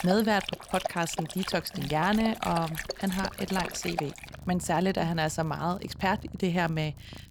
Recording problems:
animal sounds; loud; throughout; 9 dB below the speech
crackle, like an old record; faint; 30 dB below the speech

